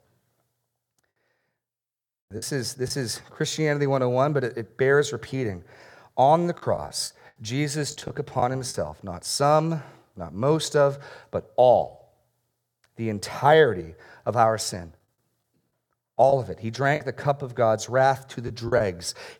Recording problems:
choppy; very; at 2.5 s, from 6.5 to 8.5 s and from 16 to 19 s; 7% of the speech affected

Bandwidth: 18 kHz